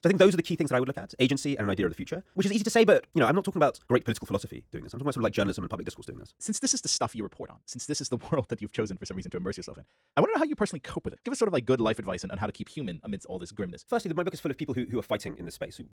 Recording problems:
wrong speed, natural pitch; too fast; 1.6 times normal speed

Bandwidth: 18 kHz